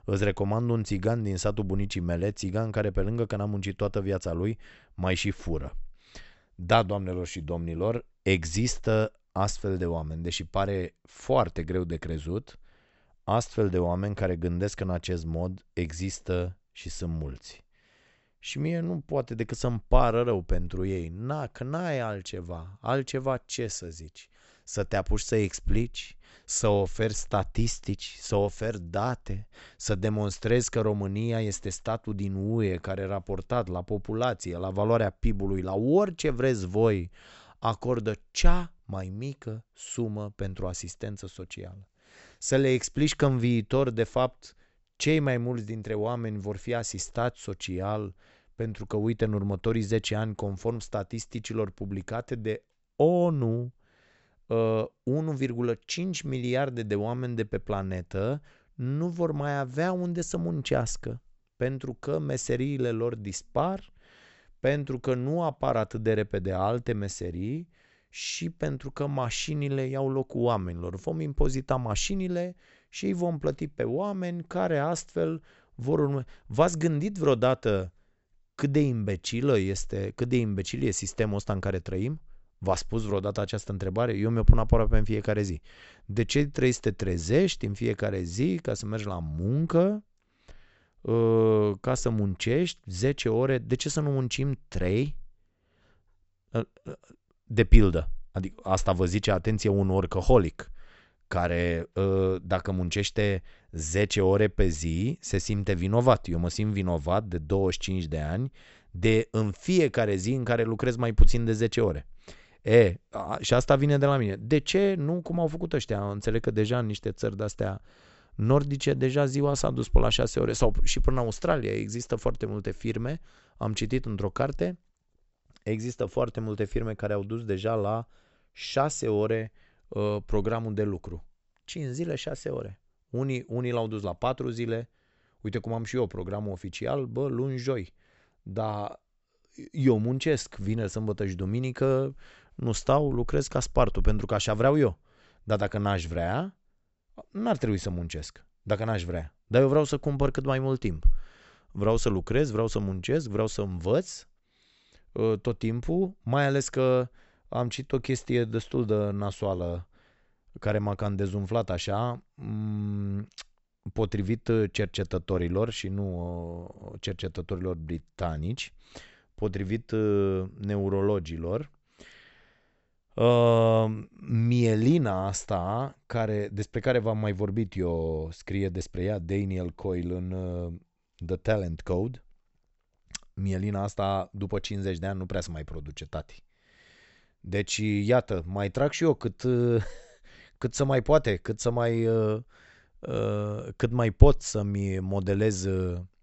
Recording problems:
high frequencies cut off; noticeable; nothing above 8 kHz

